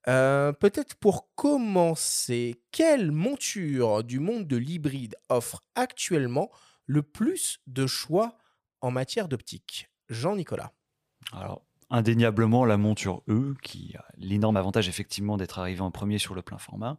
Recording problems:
uneven, jittery; strongly; from 1 to 15 s

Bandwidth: 15 kHz